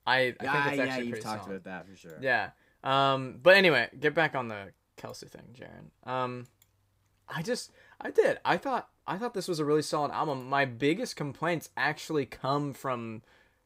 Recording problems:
none

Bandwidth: 15.5 kHz